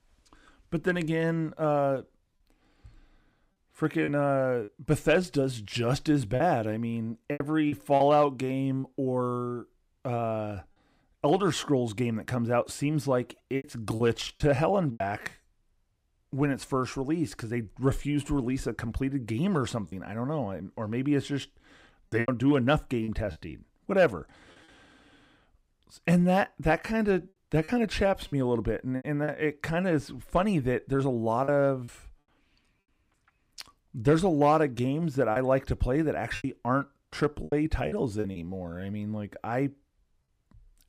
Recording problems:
choppy; occasionally; 5% of the speech affected

